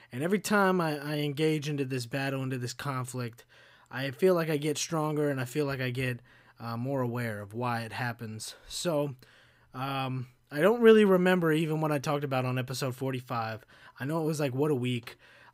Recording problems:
none

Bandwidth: 15.5 kHz